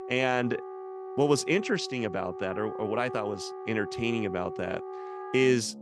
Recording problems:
background music; loud; throughout; 10 dB below the speech

